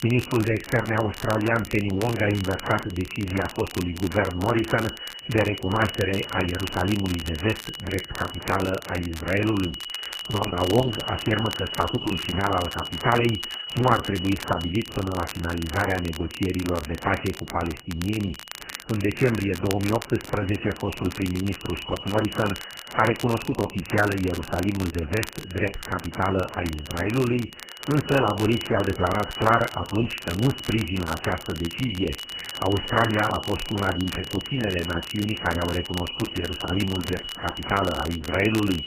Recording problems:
garbled, watery; badly; nothing above 2.5 kHz
high-pitched whine; loud; throughout; 3 kHz, 10 dB below the speech
crackle, like an old record; noticeable; 15 dB below the speech

